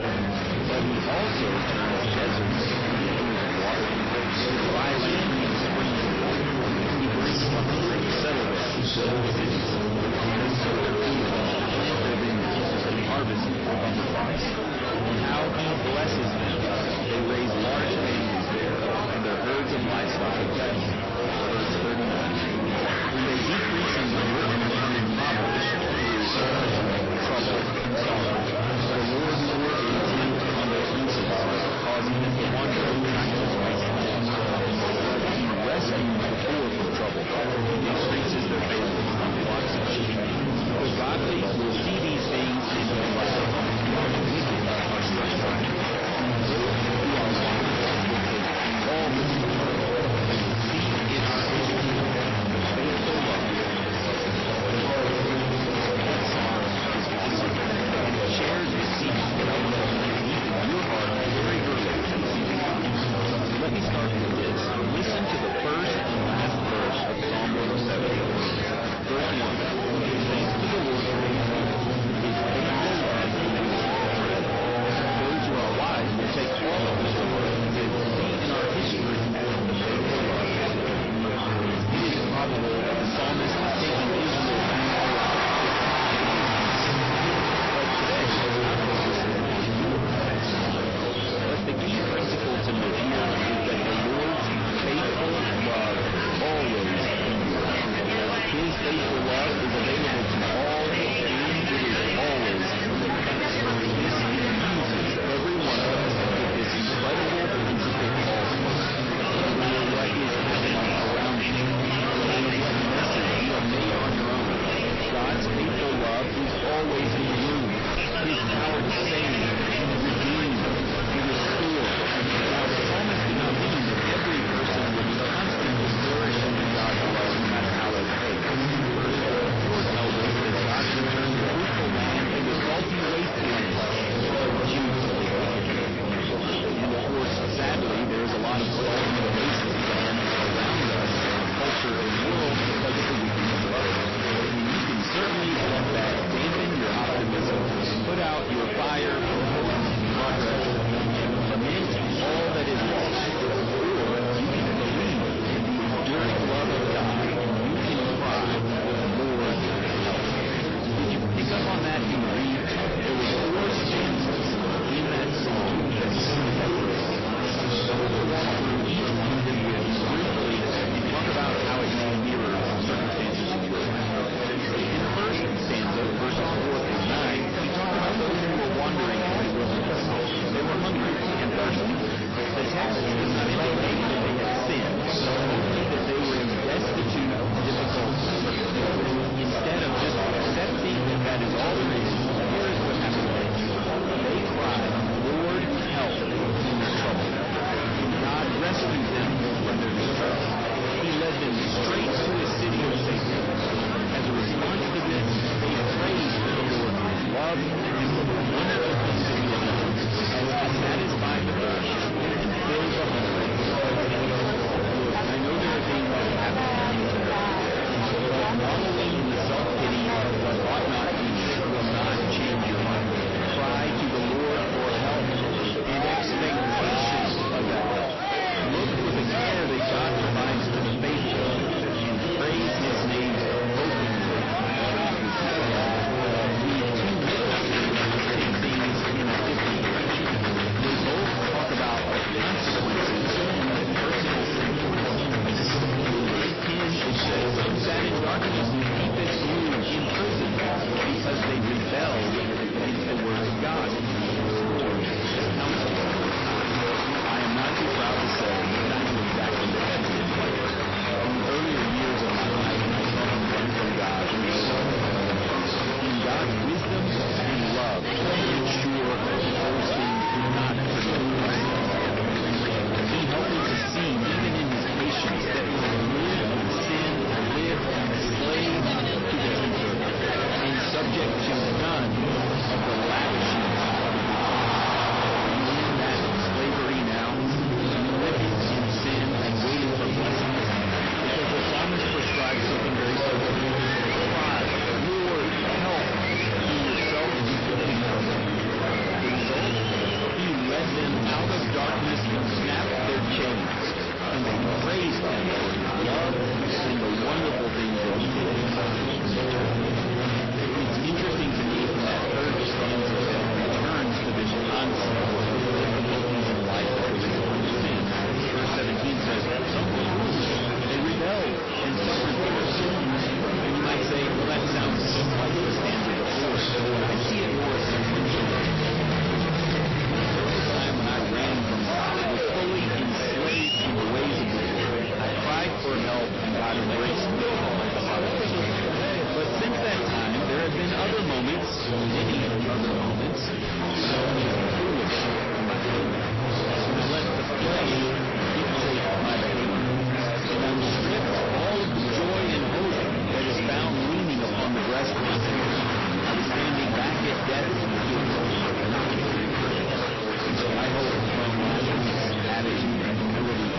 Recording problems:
distortion; heavy; 44% of the sound clipped
garbled, watery; slightly; nothing above 5.5 kHz
chatter from many people; very loud; throughout; 3 dB above the speech

